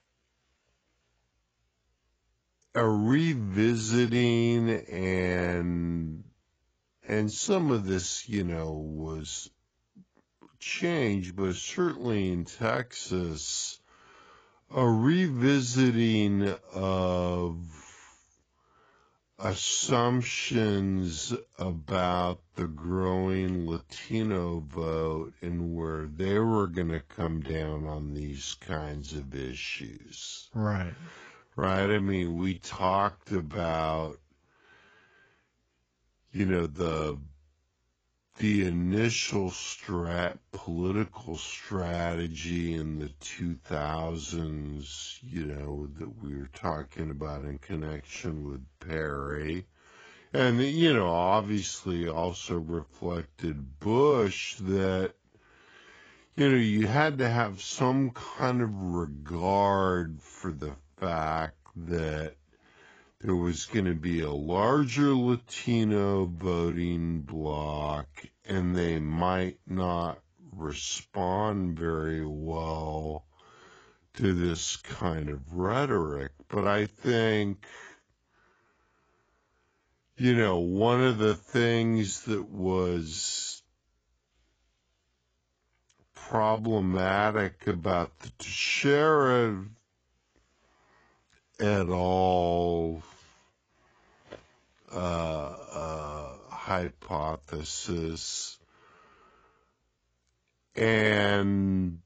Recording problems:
garbled, watery; badly; nothing above 7.5 kHz
wrong speed, natural pitch; too slow; 0.5 times normal speed

